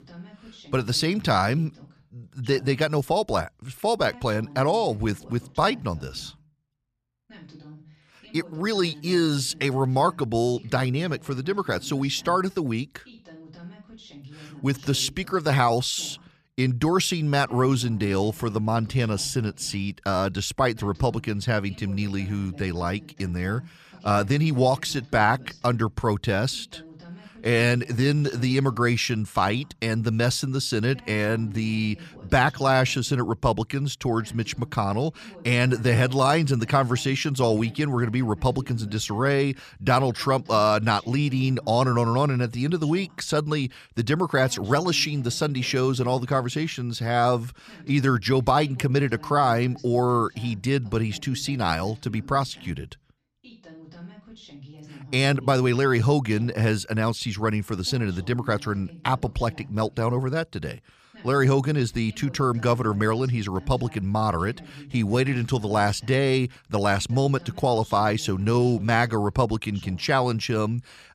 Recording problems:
voice in the background; faint; throughout; 20 dB below the speech

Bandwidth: 14.5 kHz